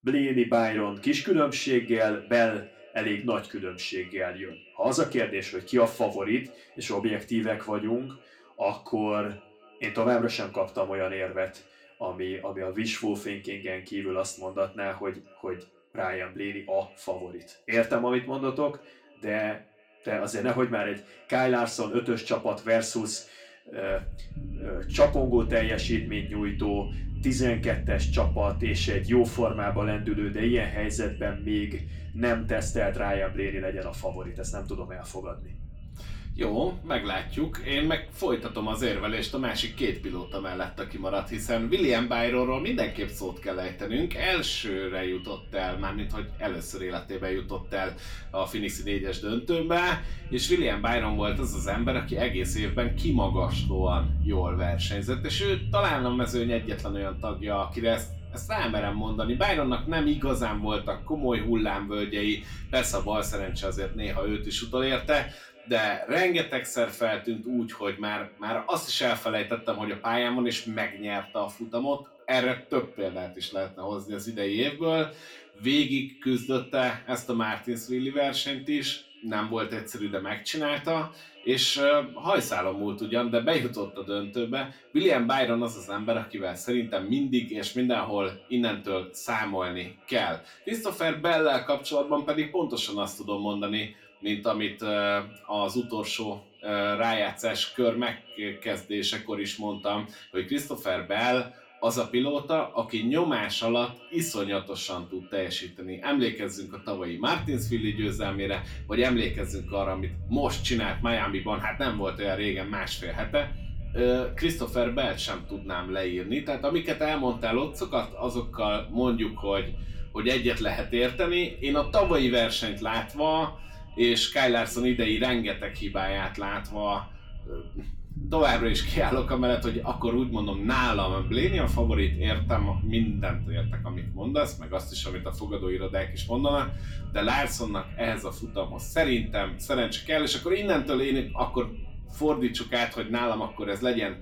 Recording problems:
echo of what is said; faint; throughout; 220 ms later, 25 dB below the speech
room echo; very slight; dies away in 0.3 s
off-mic speech; somewhat distant
low rumble; faint; from 24 s to 1:05 and from 1:47 on; 20 dB below the speech

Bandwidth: 17.5 kHz